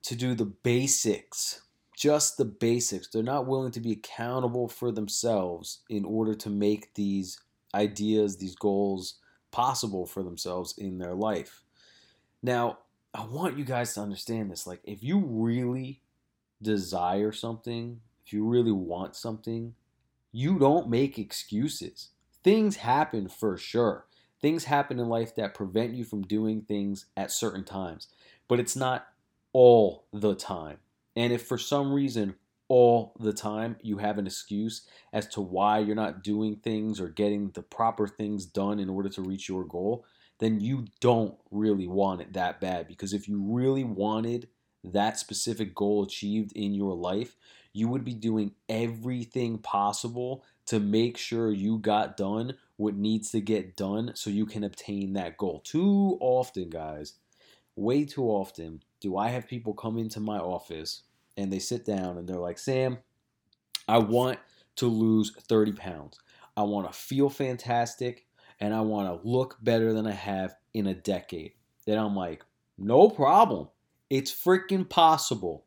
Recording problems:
none

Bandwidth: 17.5 kHz